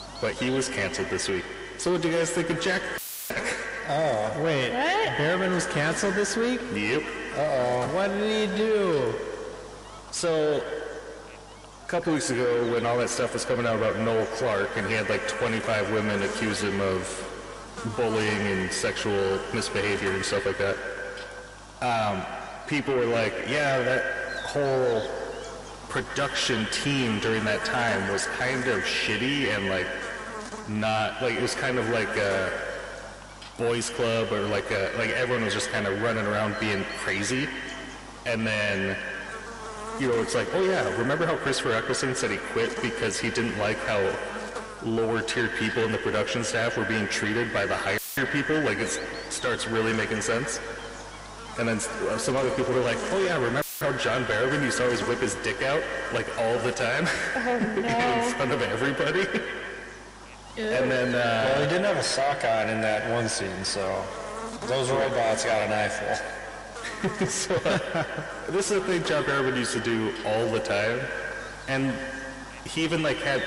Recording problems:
distortion; heavy; 7 dB below the speech
echo of what is said; strong; throughout; 130 ms later, 6 dB below the speech
garbled, watery; slightly; nothing above 11 kHz
electrical hum; noticeable; throughout; 50 Hz, 15 dB below the speech
audio cutting out; filled with static; at 3 s, at 48 s and at 54 s

